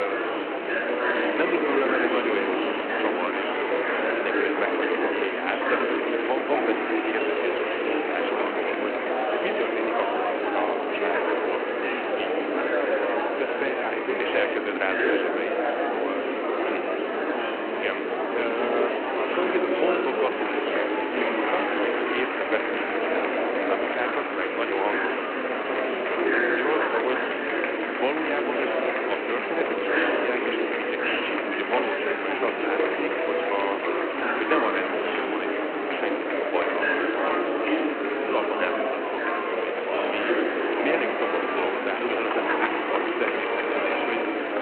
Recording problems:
echo of what is said; noticeable; throughout; 80 ms later, 20 dB below the speech
phone-call audio
murmuring crowd; very loud; throughout; 5 dB above the speech
hiss; loud; throughout; 5 dB below the speech
abrupt cut into speech; at the start

